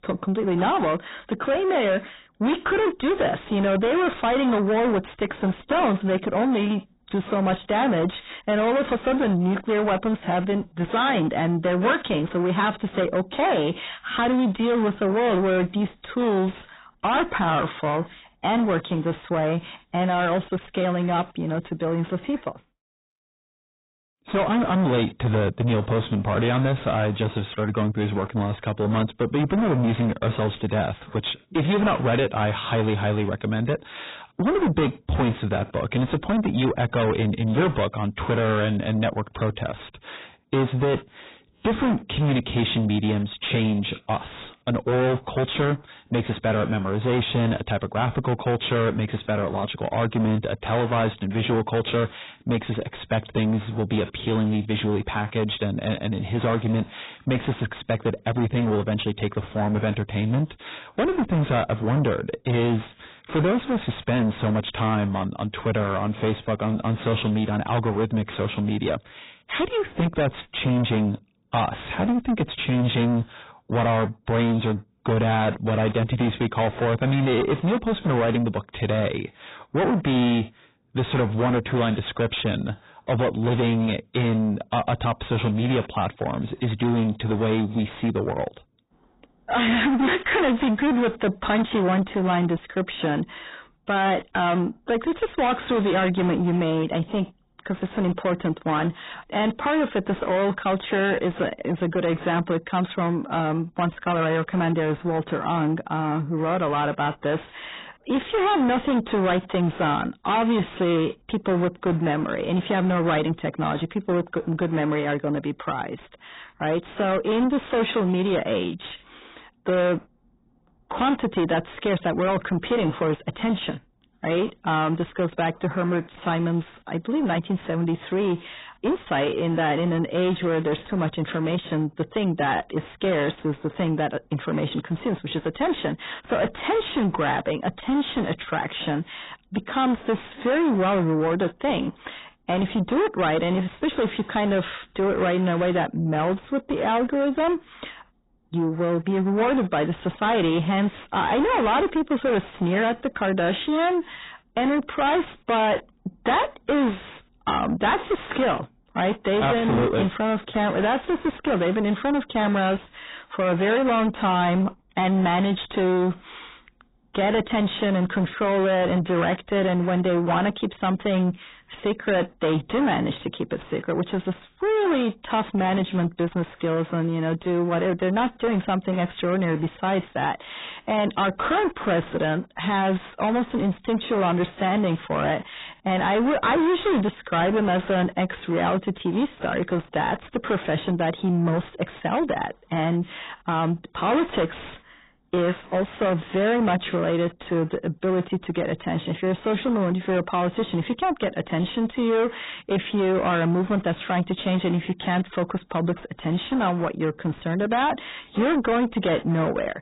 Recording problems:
distortion; heavy; 7 dB below the speech
garbled, watery; badly; nothing above 4 kHz

